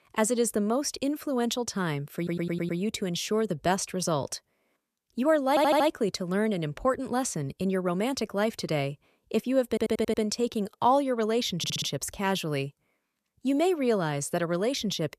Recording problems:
audio stuttering; 4 times, first at 2 s

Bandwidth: 14.5 kHz